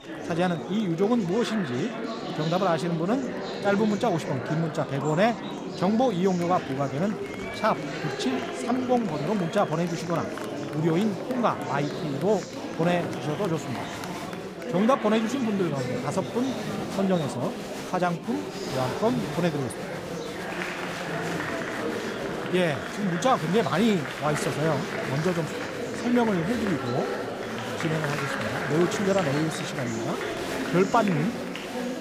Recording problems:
murmuring crowd; loud; throughout; 5 dB below the speech

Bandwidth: 15.5 kHz